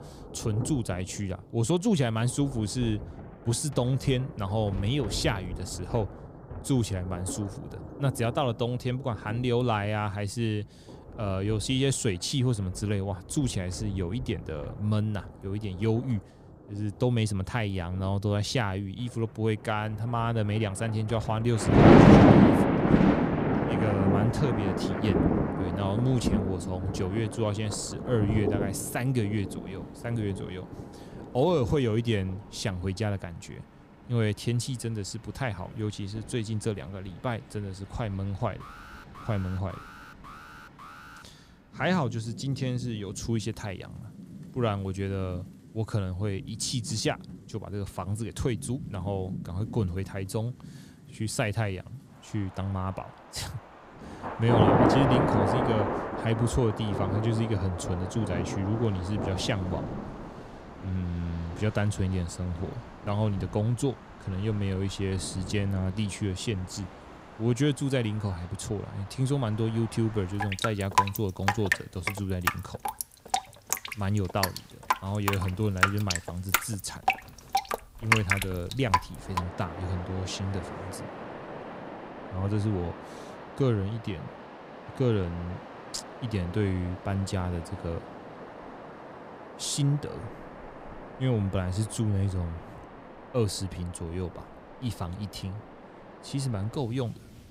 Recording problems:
rain or running water; very loud; throughout; 2 dB above the speech
alarm; faint; from 39 to 41 s; peak 15 dB below the speech

